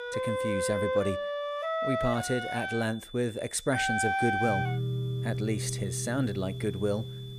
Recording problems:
background music; loud; throughout; as loud as the speech
high-pitched whine; noticeable; throughout; 3.5 kHz, 15 dB below the speech

